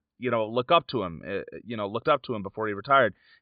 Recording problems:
high frequencies cut off; severe; nothing above 4.5 kHz

